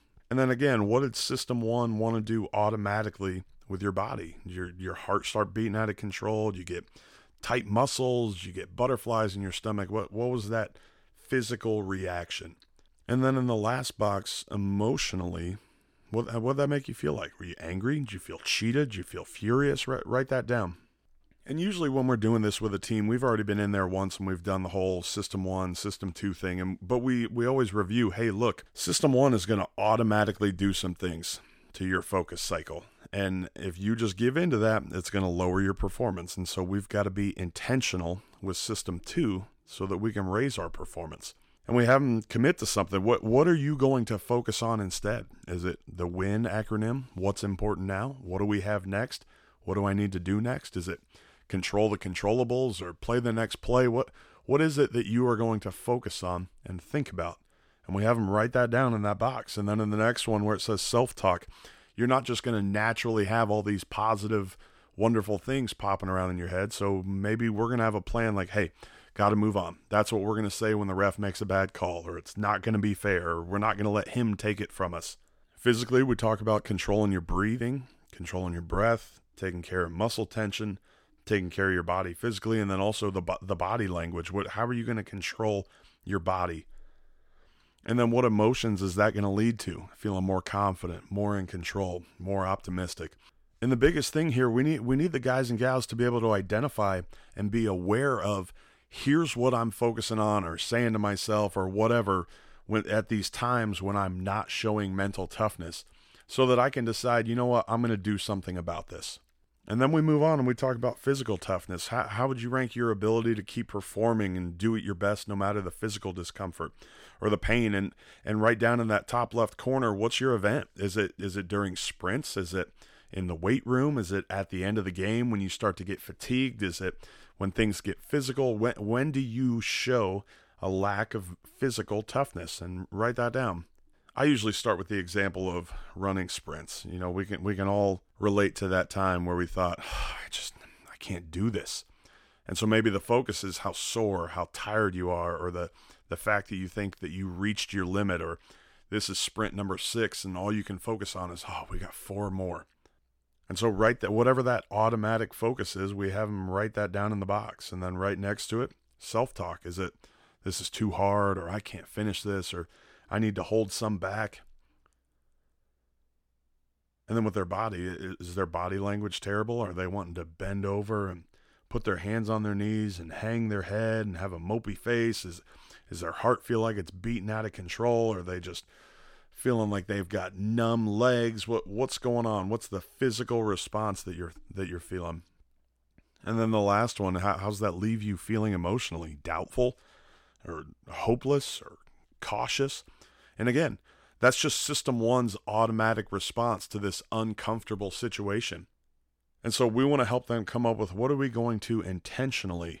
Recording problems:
none

